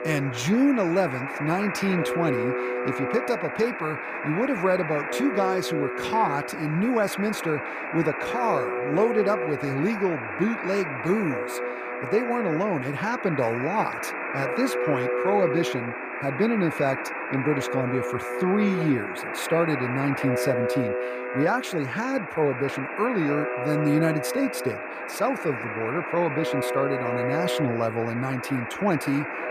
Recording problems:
alarms or sirens; loud; throughout; 3 dB below the speech

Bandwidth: 15 kHz